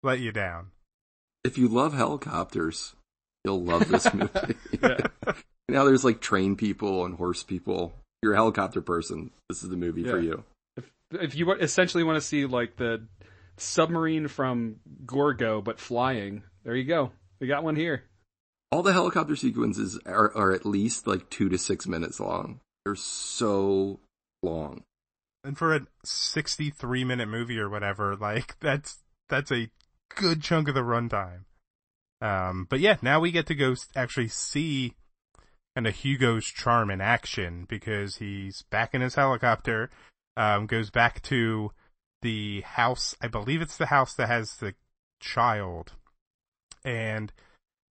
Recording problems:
garbled, watery; slightly; nothing above 8 kHz

